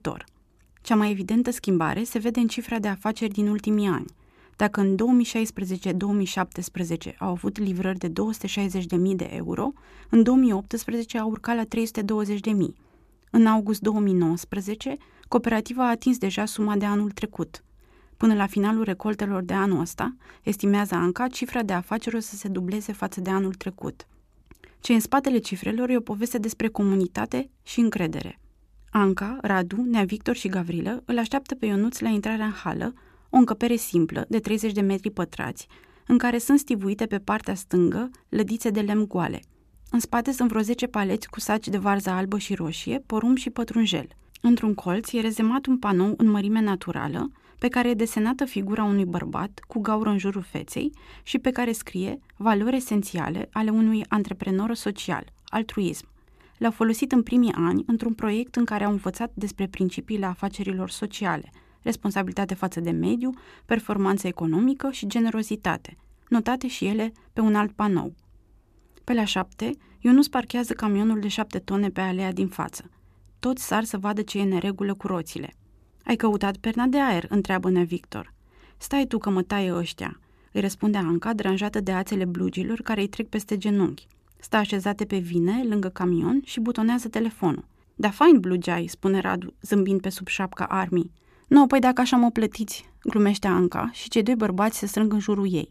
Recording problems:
none

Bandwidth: 14.5 kHz